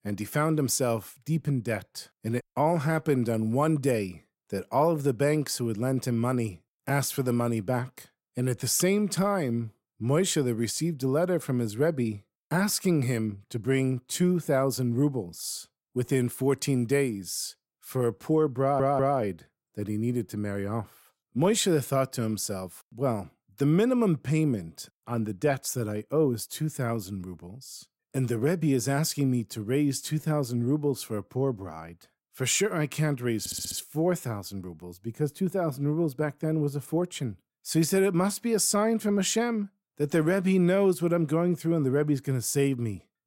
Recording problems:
audio stuttering; at 19 s and at 33 s

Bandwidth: 16 kHz